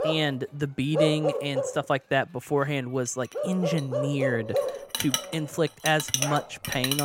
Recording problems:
animal sounds; loud; throughout; 3 dB below the speech
household noises; loud; throughout; 2 dB below the speech
abrupt cut into speech; at the end

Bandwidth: 16 kHz